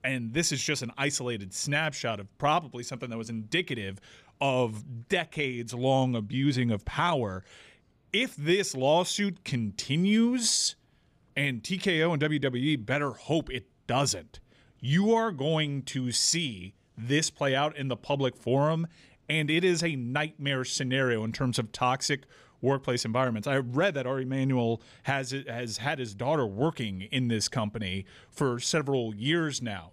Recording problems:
none

